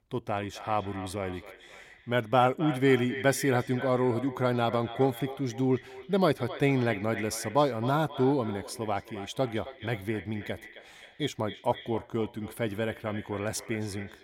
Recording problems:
echo of what is said; noticeable; throughout; 270 ms later, 15 dB below the speech

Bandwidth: 16.5 kHz